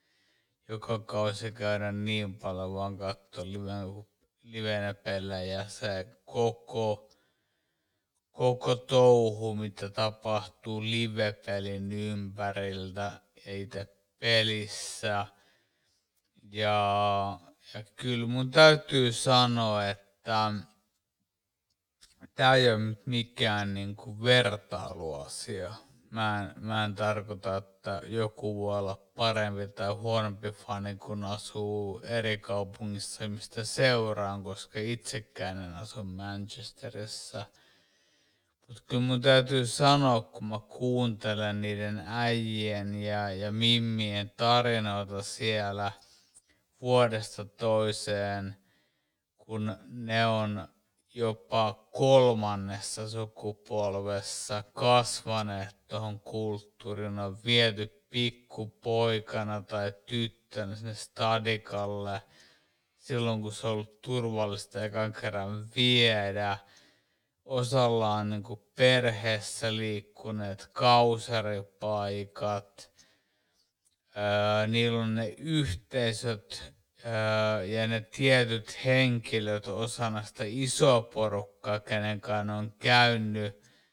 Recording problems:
wrong speed, natural pitch; too slow; 0.5 times normal speed

